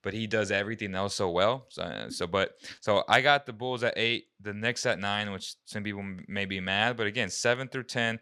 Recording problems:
none

